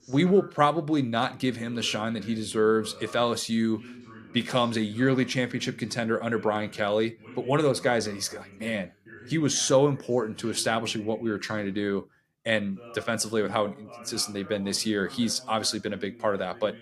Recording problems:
voice in the background; faint; throughout; 20 dB below the speech

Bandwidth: 15 kHz